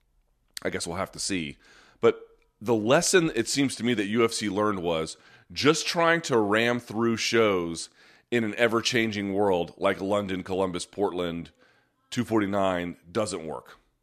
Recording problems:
none

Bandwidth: 14 kHz